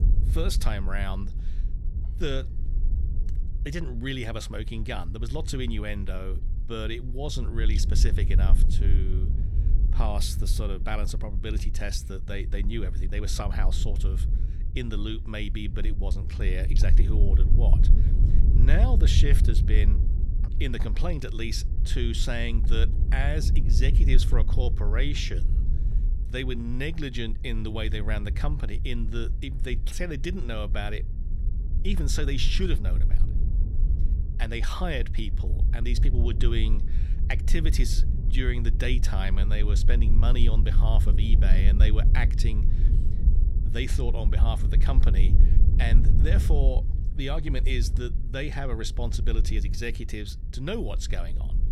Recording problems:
wind noise on the microphone; heavy; 10 dB below the speech

